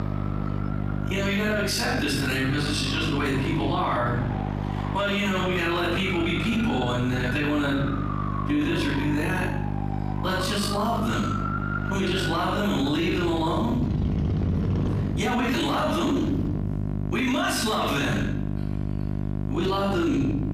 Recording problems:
off-mic speech; far
room echo; noticeable; dies away in 0.6 s
squashed, flat; somewhat
traffic noise; loud; throughout; 9 dB below the speech
electrical hum; noticeable; throughout; 50 Hz, 15 dB below the speech

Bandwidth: 15 kHz